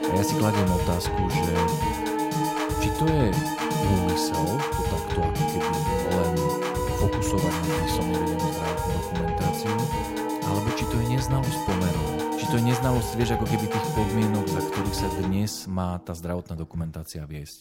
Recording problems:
background music; very loud; throughout; 2 dB above the speech

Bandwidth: 16 kHz